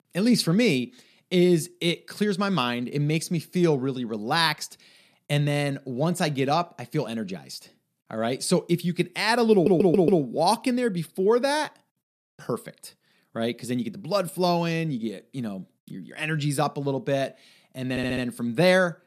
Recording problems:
audio stuttering; at 9.5 s and at 18 s

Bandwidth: 14 kHz